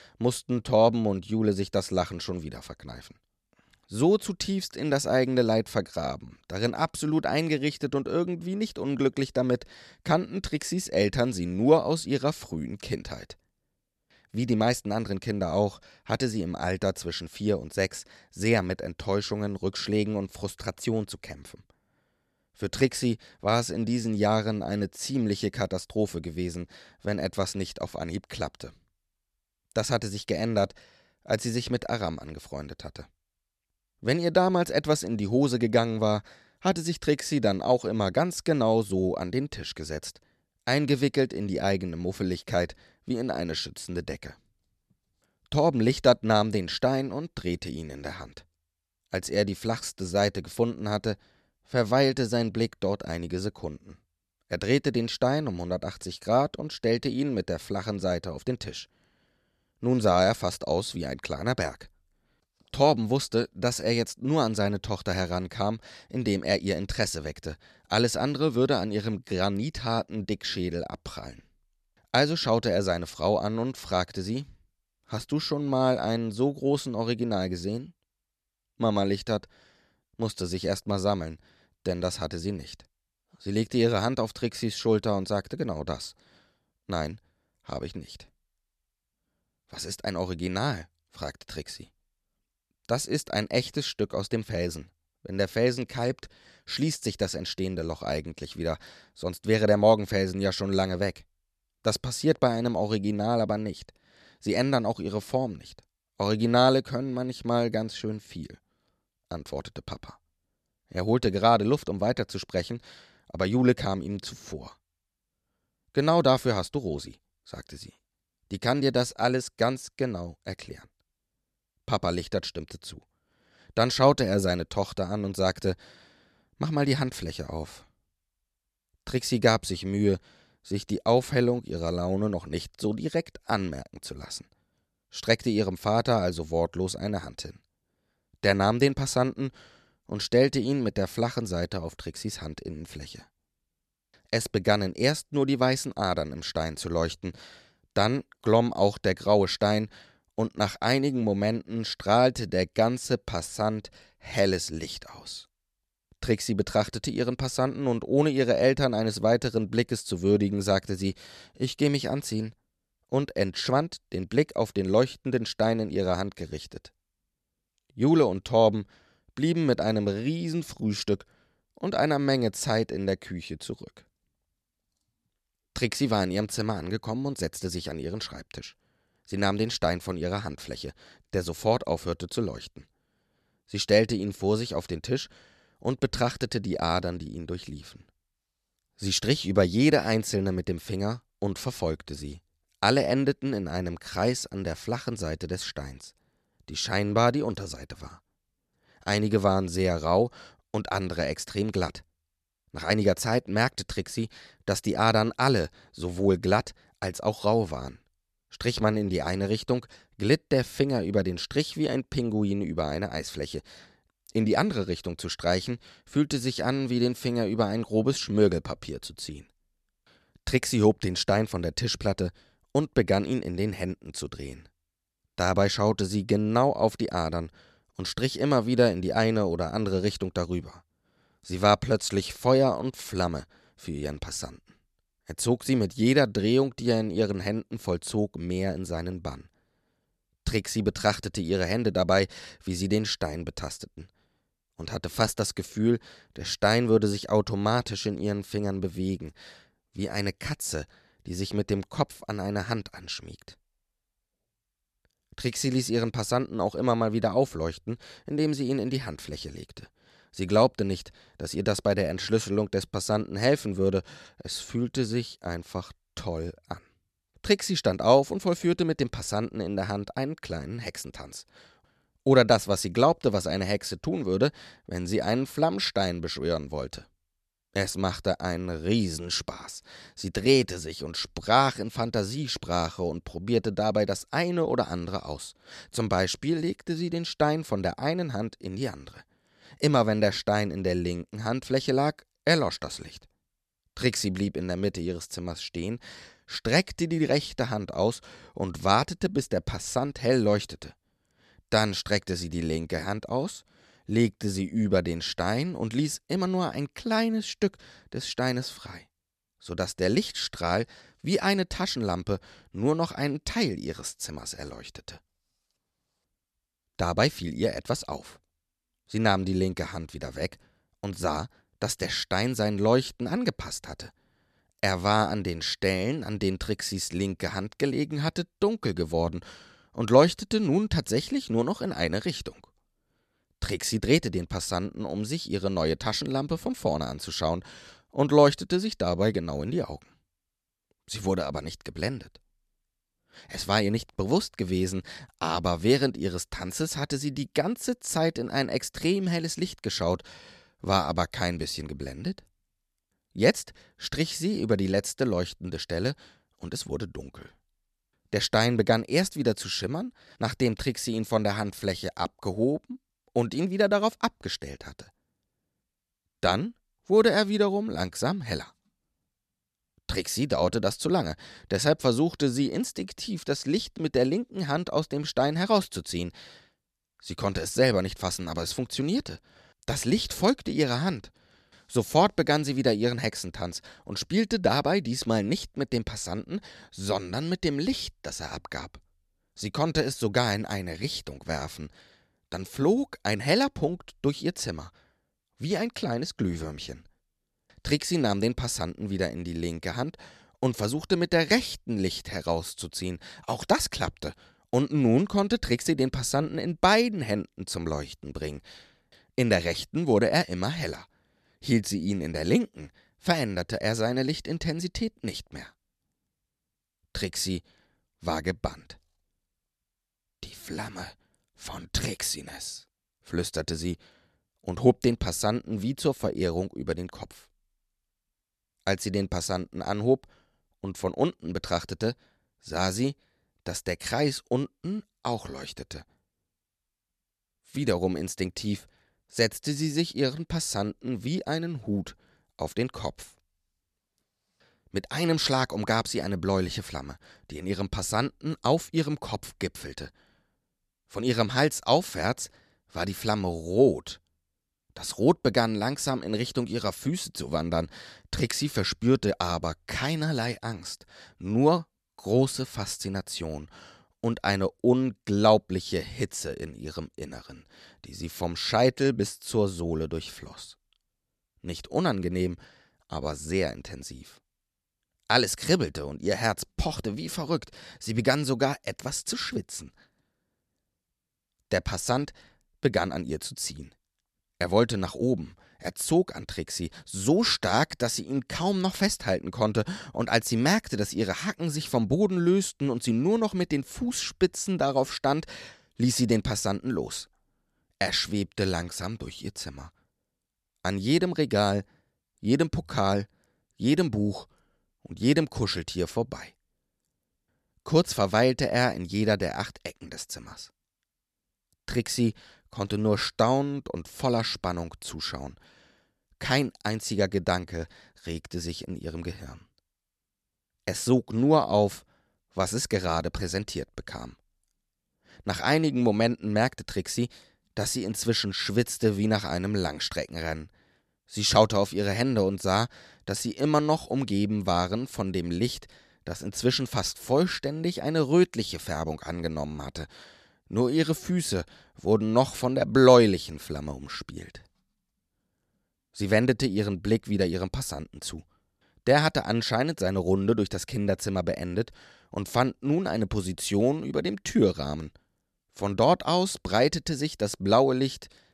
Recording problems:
none

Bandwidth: 13.5 kHz